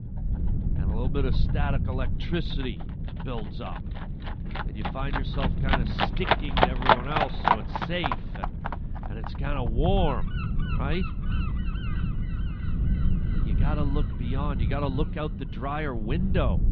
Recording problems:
muffled; slightly; fading above 3.5 kHz
animal sounds; very loud; throughout; 4 dB above the speech
wind noise on the microphone; occasional gusts; 20 dB below the speech
low rumble; noticeable; throughout; 10 dB below the speech

